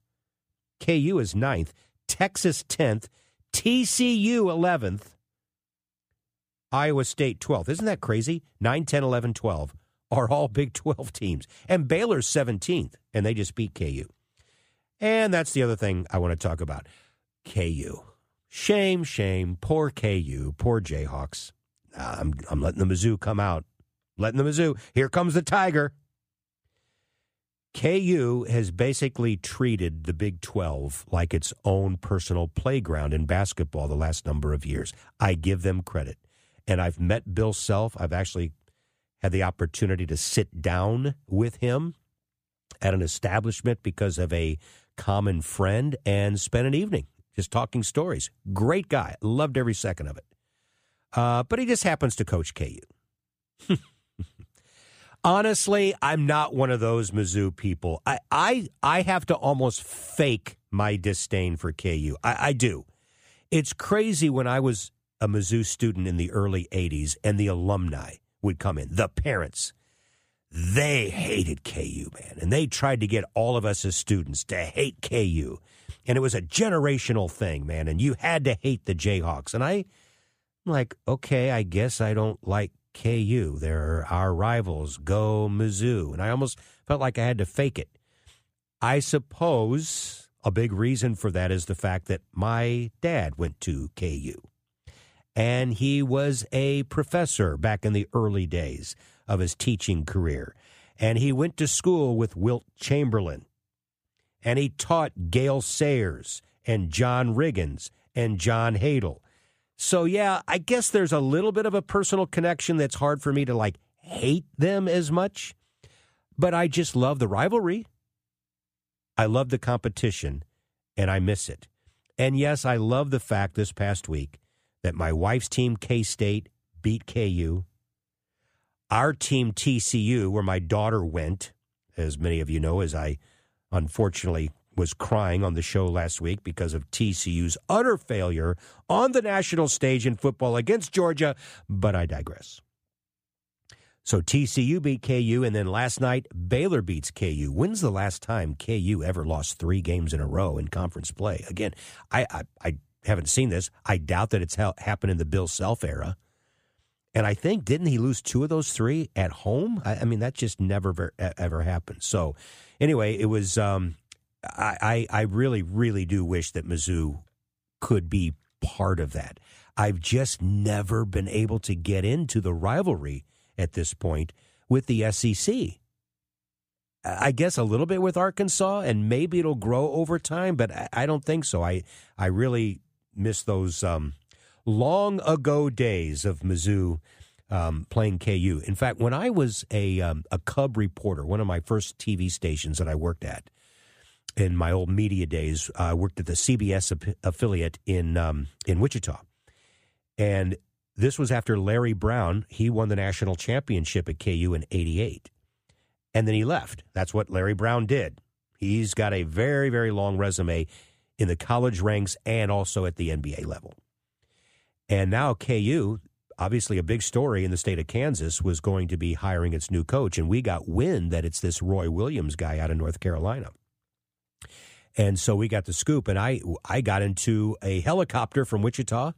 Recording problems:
none

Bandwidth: 15 kHz